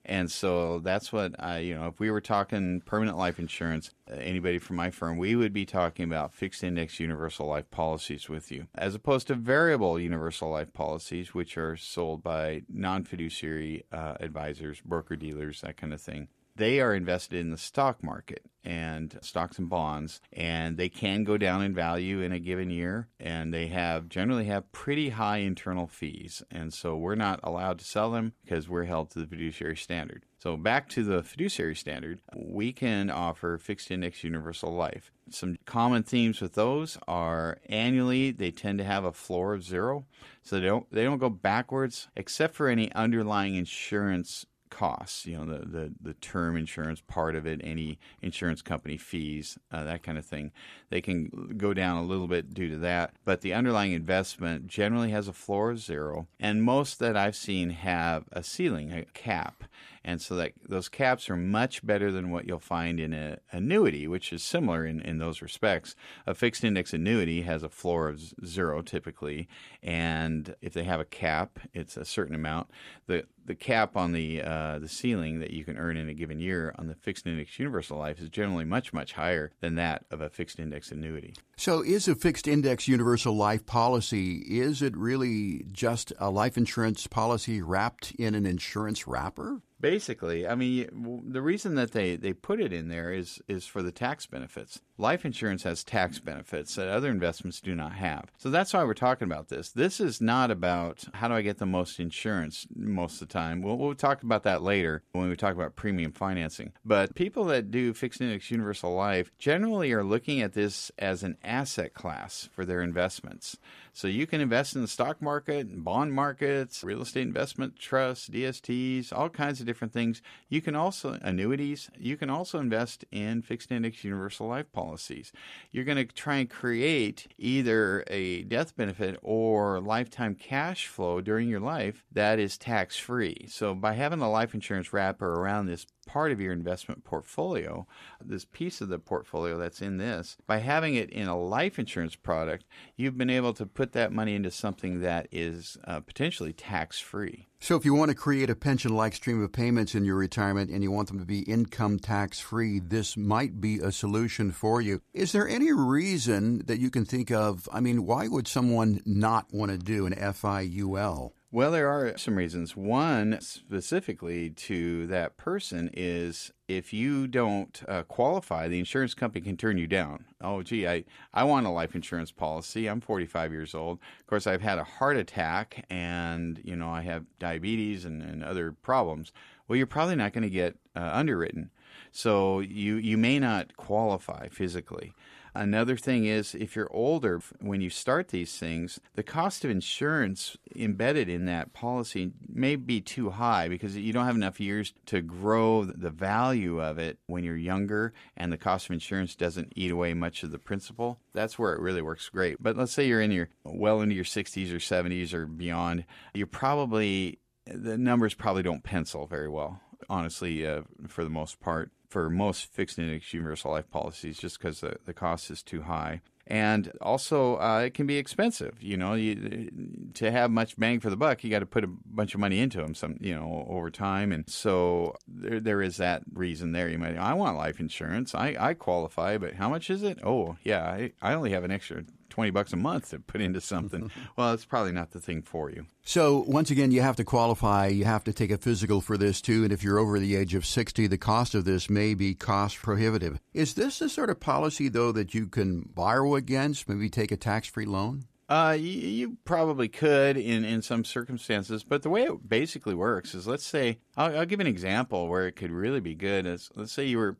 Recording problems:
none

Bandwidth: 14.5 kHz